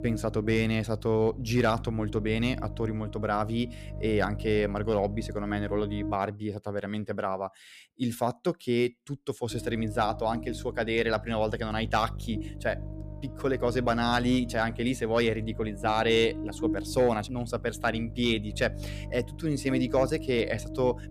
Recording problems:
electrical hum; noticeable; until 6 s and from 9.5 s on; 50 Hz, 15 dB below the speech

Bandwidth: 14.5 kHz